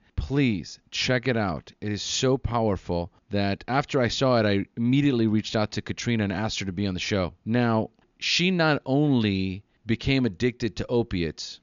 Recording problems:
high frequencies cut off; noticeable; nothing above 7 kHz

